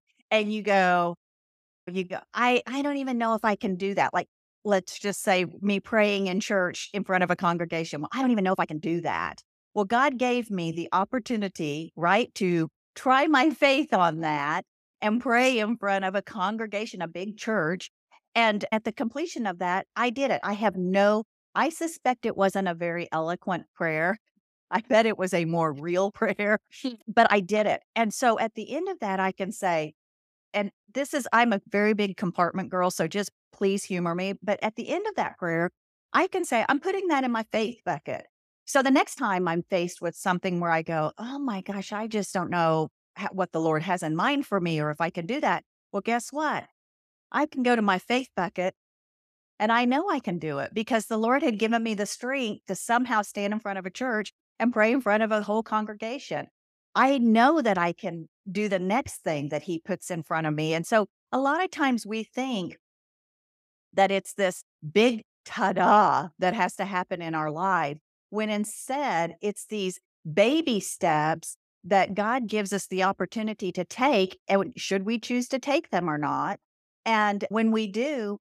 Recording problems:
uneven, jittery; strongly; from 2 s to 1:17

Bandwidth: 14.5 kHz